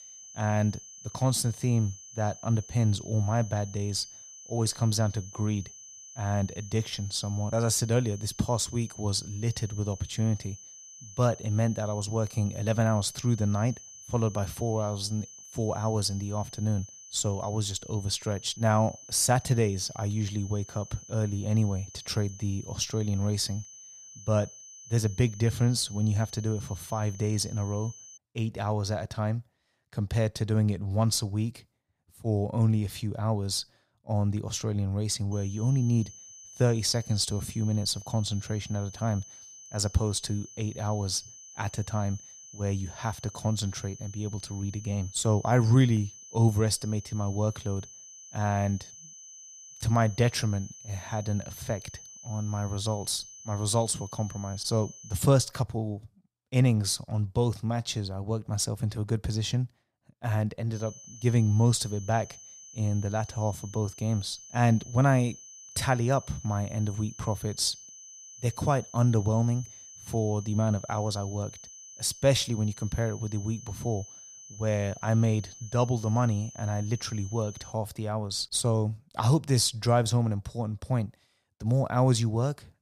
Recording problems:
high-pitched whine; noticeable; until 28 s, from 35 to 55 s and from 1:01 to 1:18; 6 kHz, 15 dB below the speech

